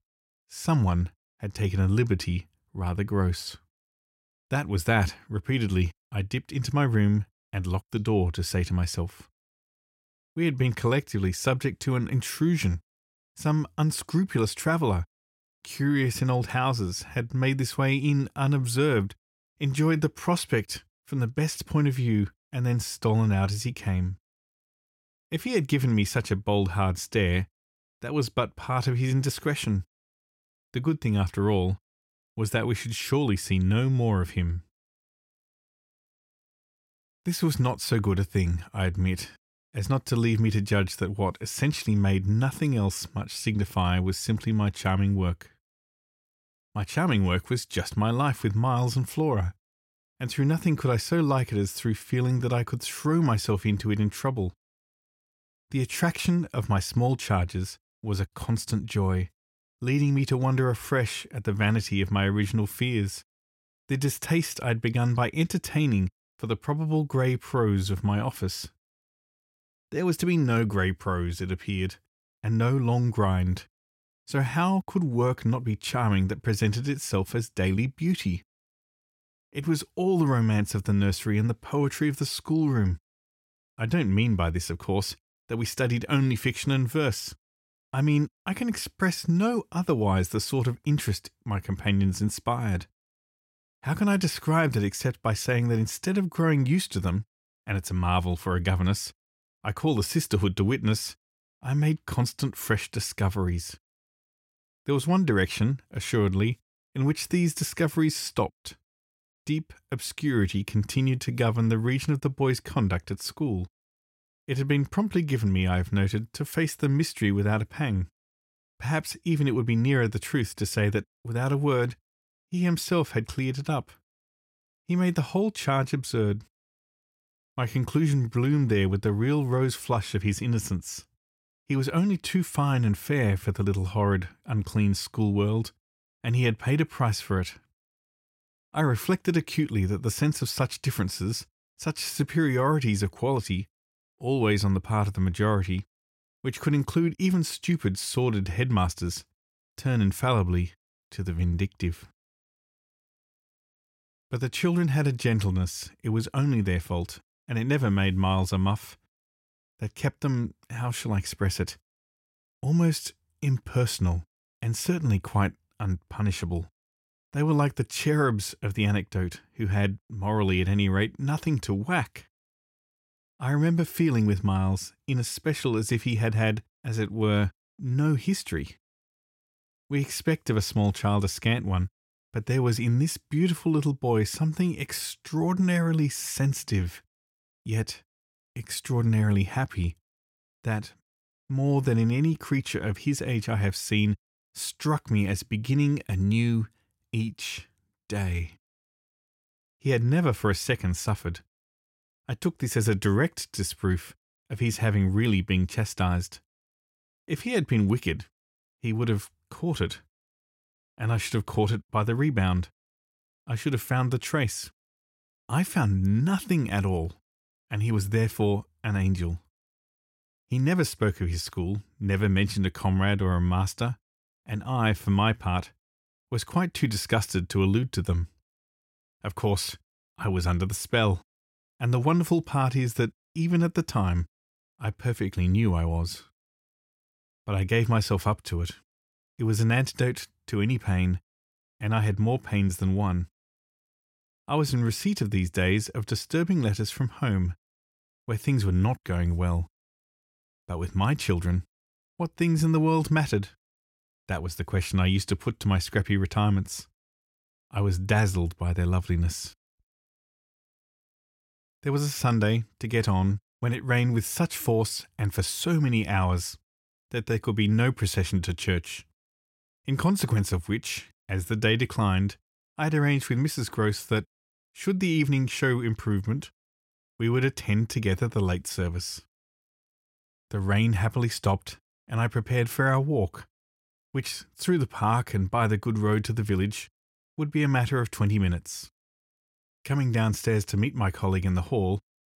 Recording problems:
none

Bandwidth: 16 kHz